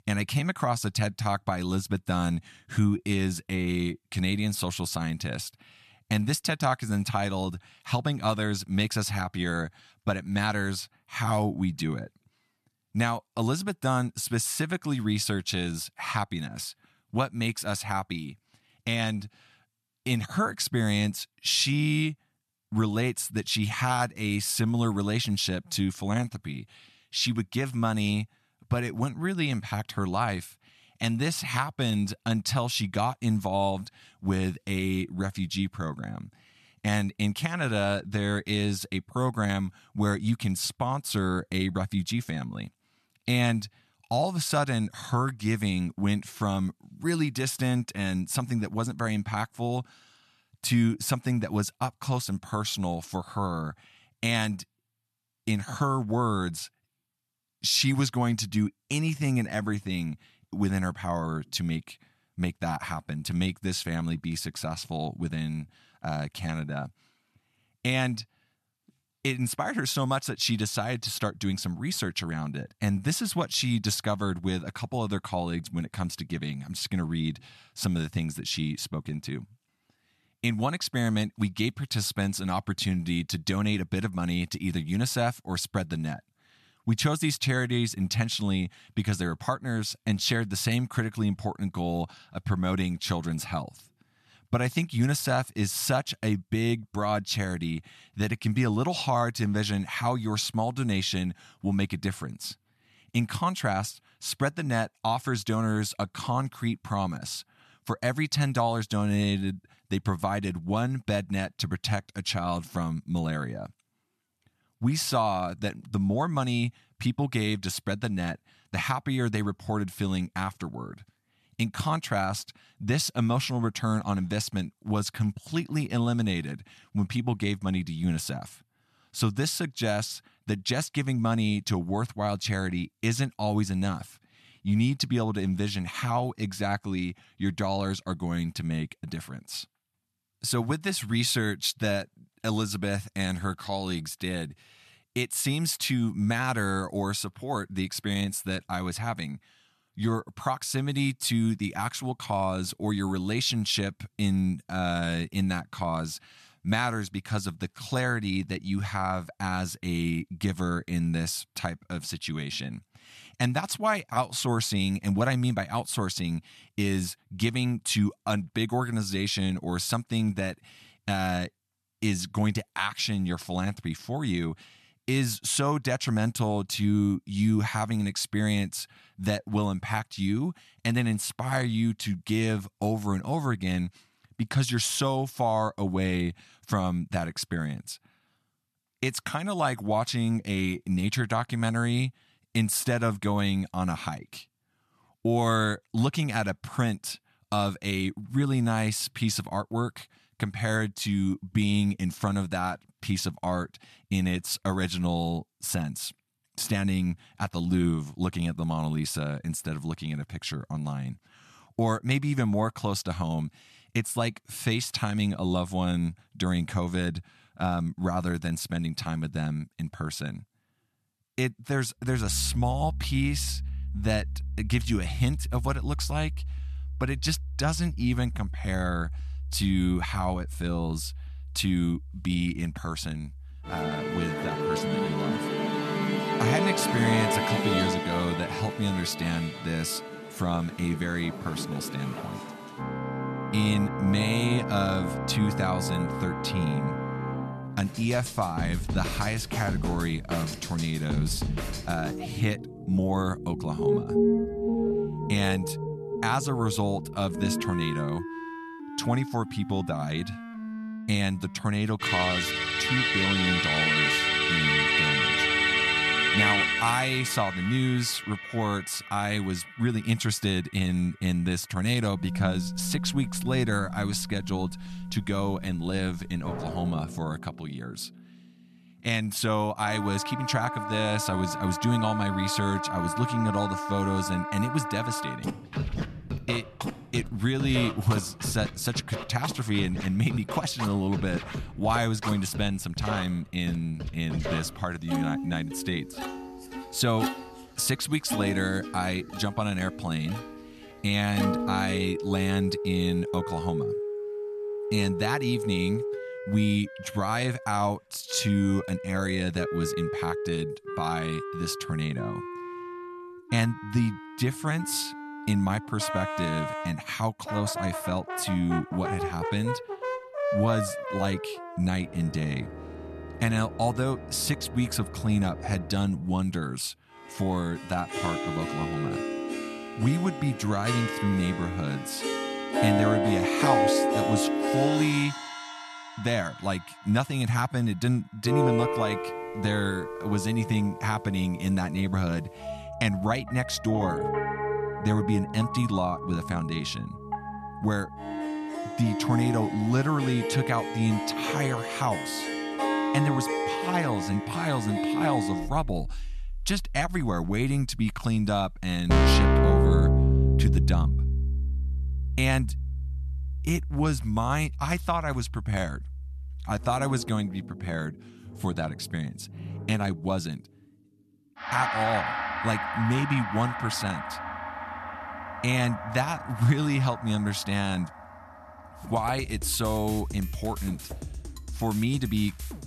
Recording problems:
background music; loud; from 3:42 on; 2 dB below the speech

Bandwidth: 13.5 kHz